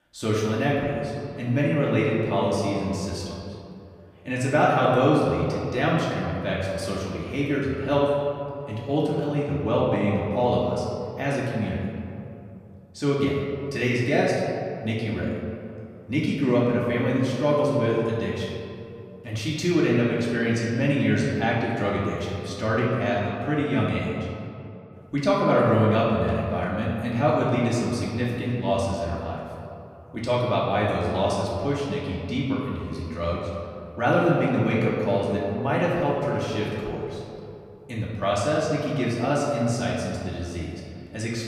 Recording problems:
off-mic speech; far
room echo; noticeable; dies away in 2.3 s

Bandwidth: 15 kHz